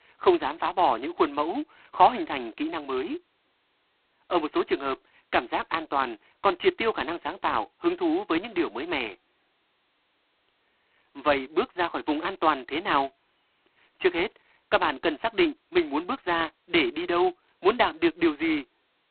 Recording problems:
phone-call audio; poor line; nothing above 4 kHz

